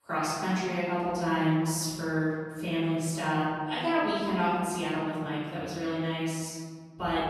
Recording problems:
room echo; strong; dies away in 2.1 s
off-mic speech; far

